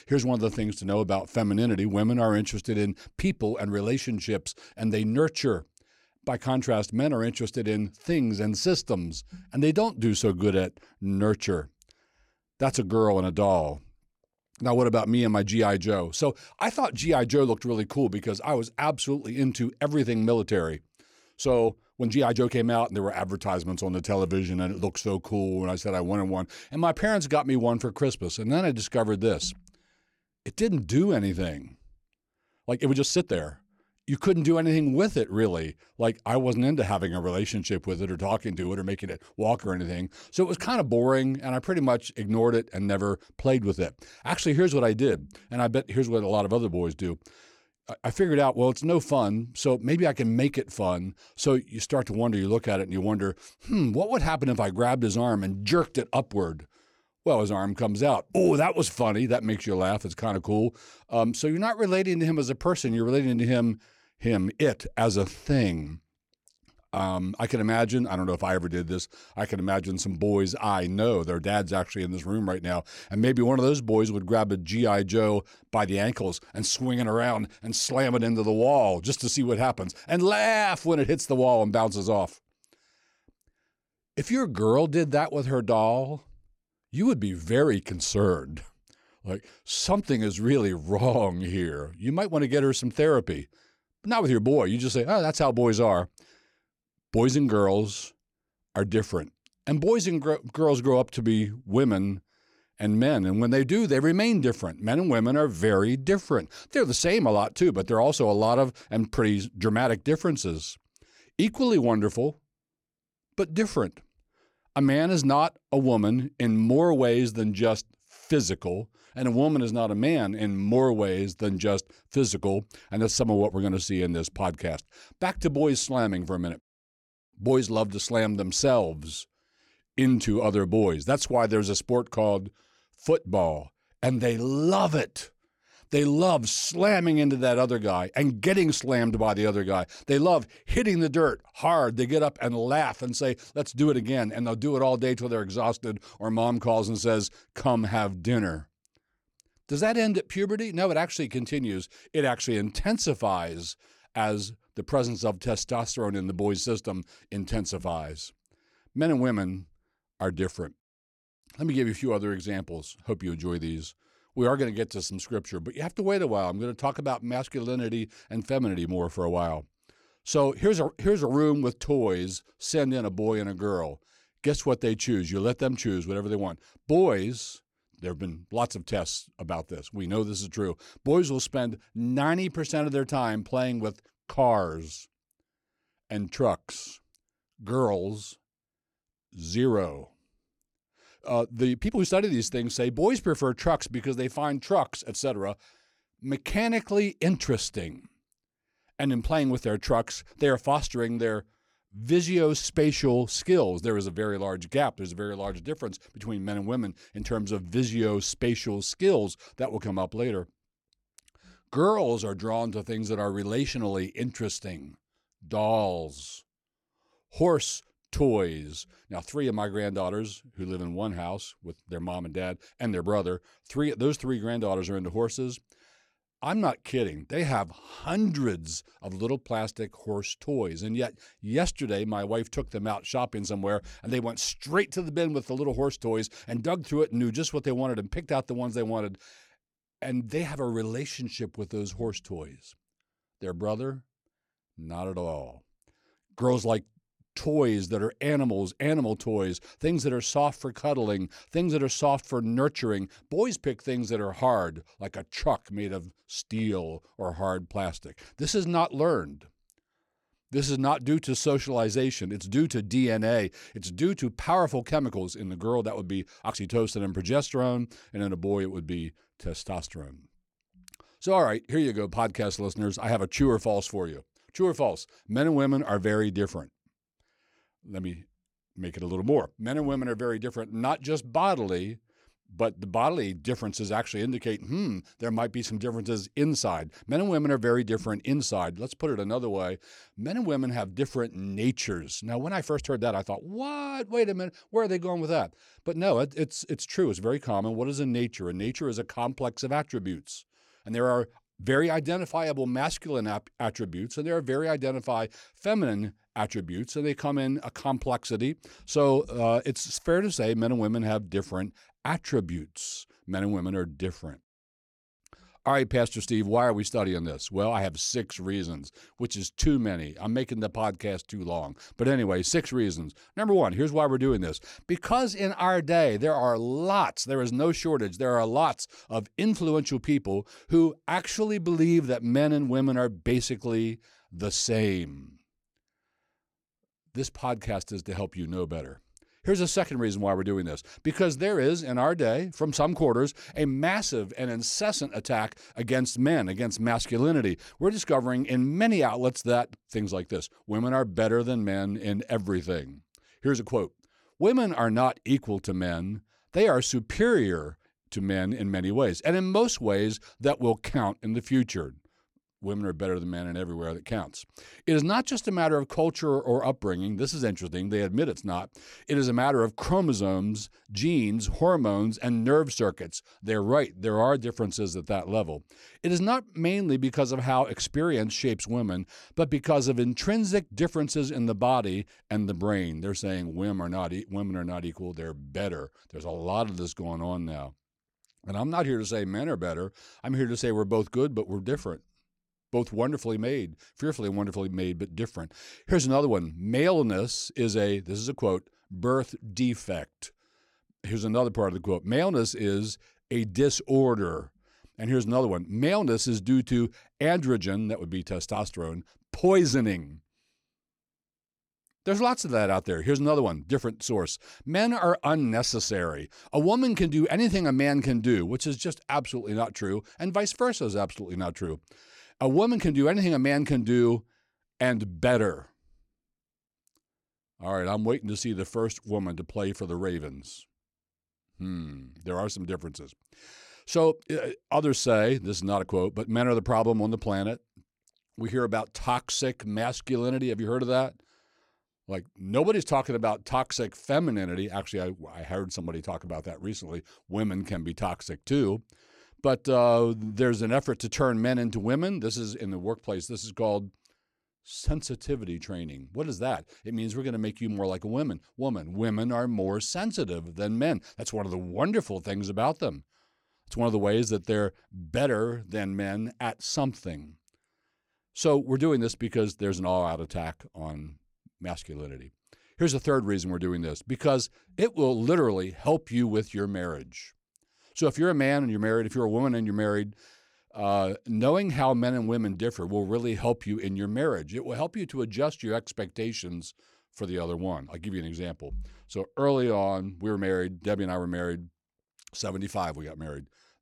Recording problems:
uneven, jittery; strongly; from 21 s to 8:10

